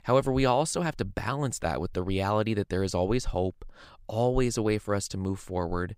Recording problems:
none

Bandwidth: 15.5 kHz